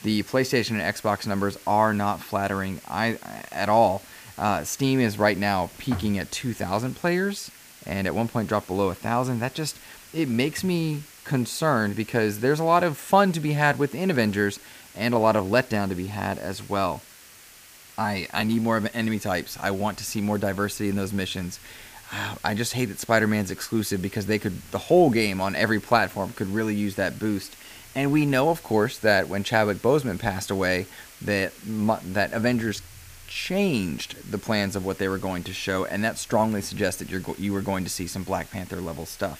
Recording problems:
hiss; faint; throughout; 20 dB below the speech

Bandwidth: 15 kHz